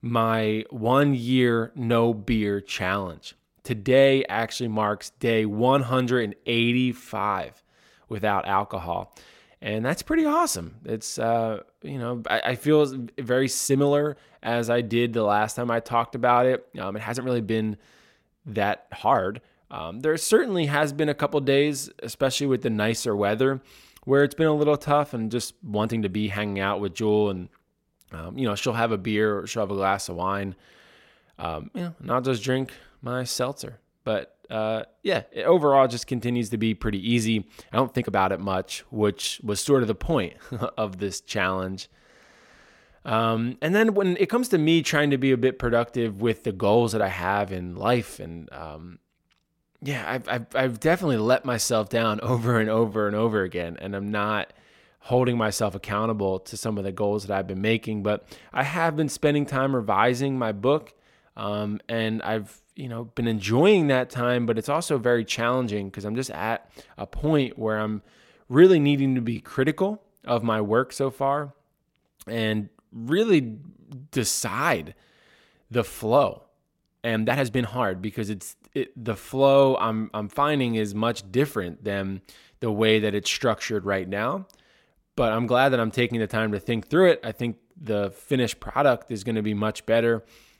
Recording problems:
uneven, jittery; strongly; from 6.5 s to 1:20

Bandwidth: 16.5 kHz